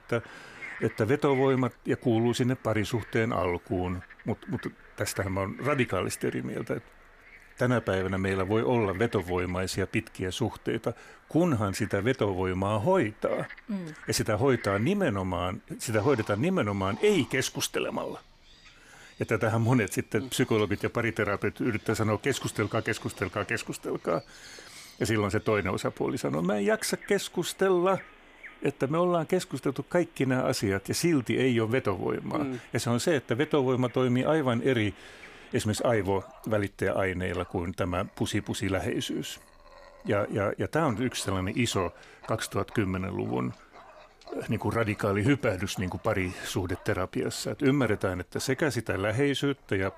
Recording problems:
animal sounds; faint; throughout; 20 dB below the speech

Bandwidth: 15 kHz